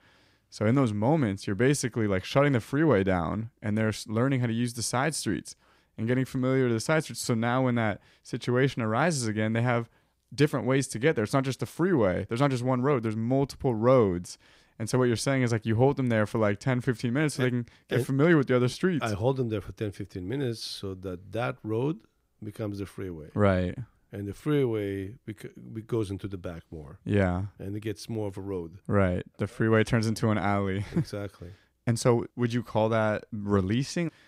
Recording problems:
none

